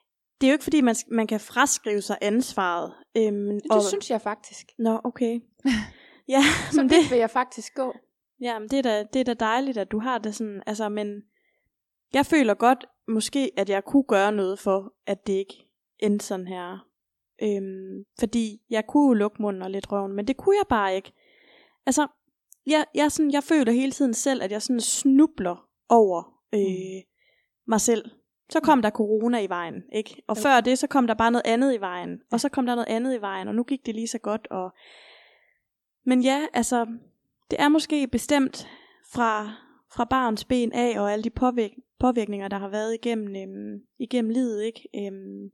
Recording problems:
none

